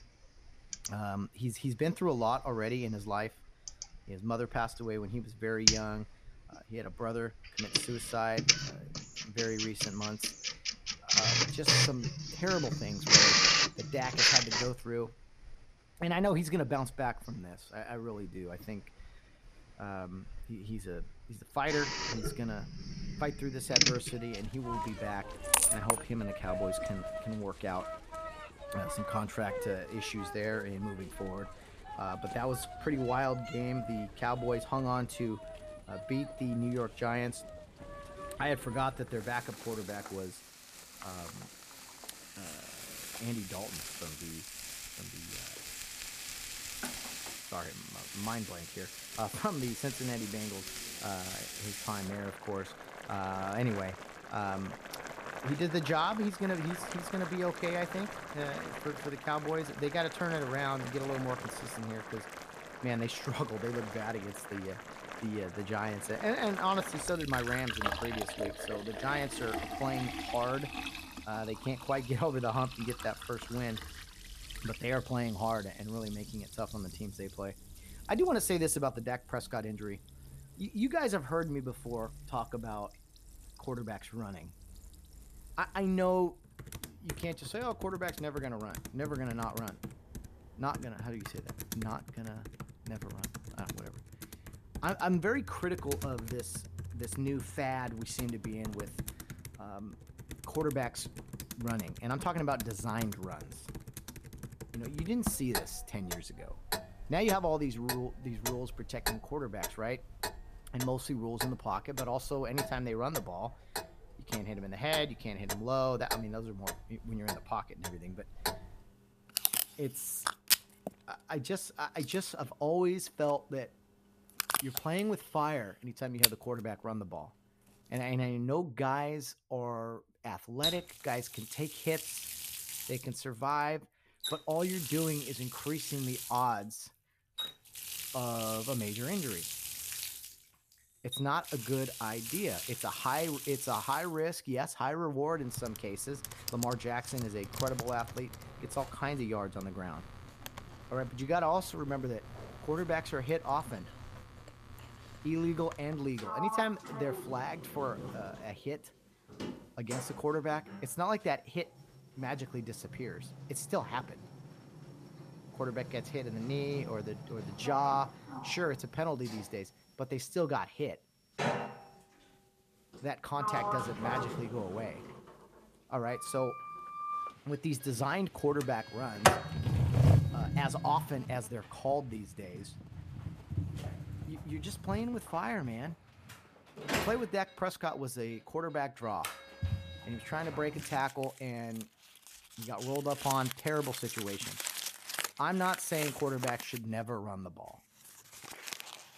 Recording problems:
household noises; very loud; throughout; 1 dB above the speech

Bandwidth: 14.5 kHz